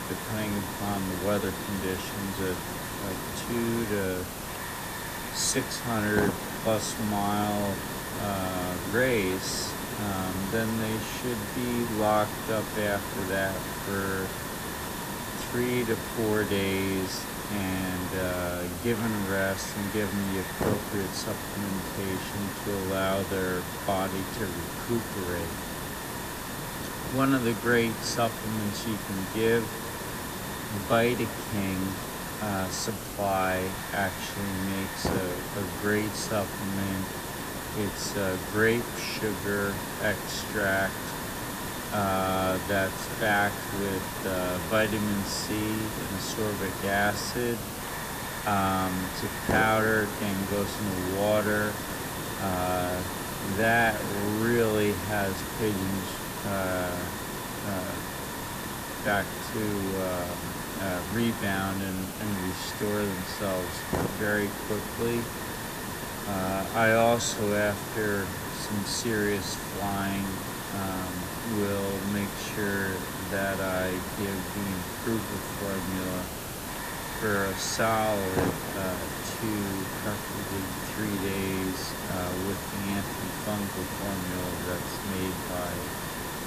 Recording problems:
wrong speed, natural pitch; too slow; 0.6 times normal speed
echo of what is said; faint; throughout; 330 ms later, 25 dB below the speech
hiss; loud; throughout; 3 dB below the speech

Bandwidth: 14.5 kHz